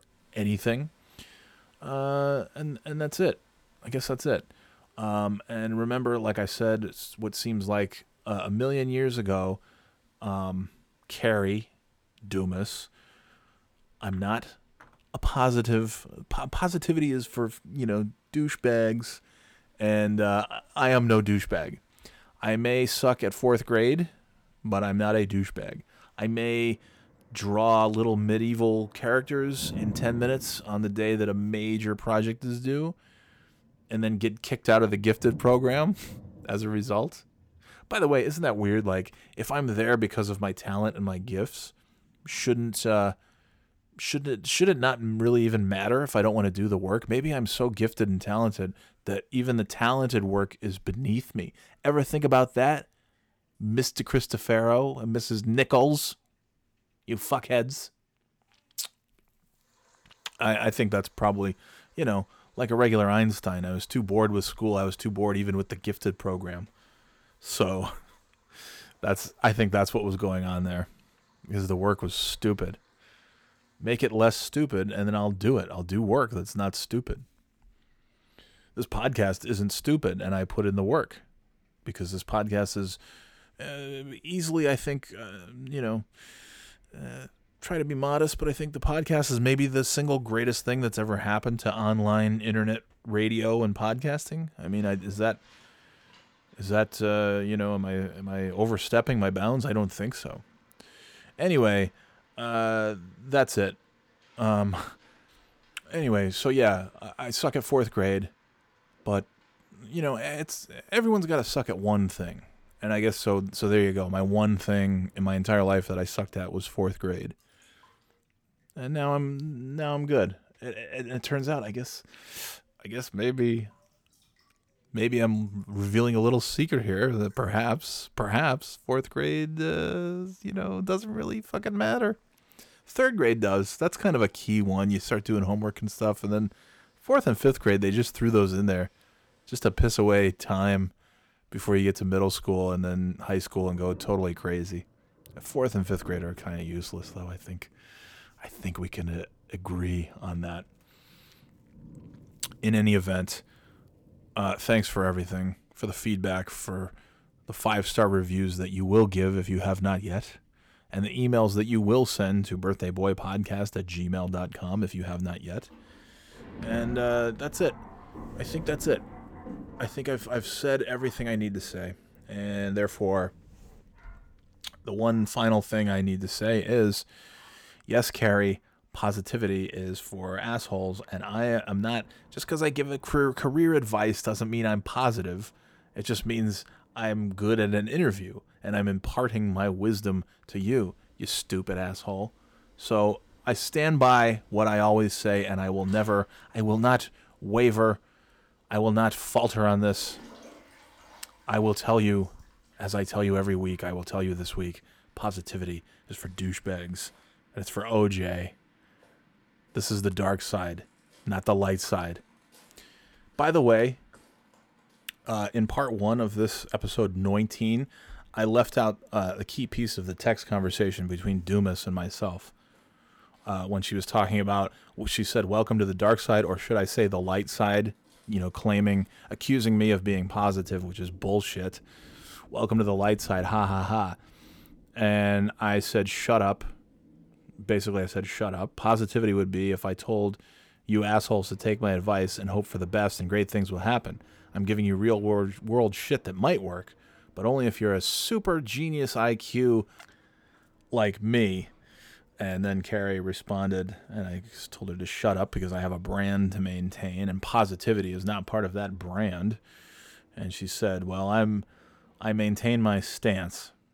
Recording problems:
rain or running water; faint; throughout; 25 dB below the speech

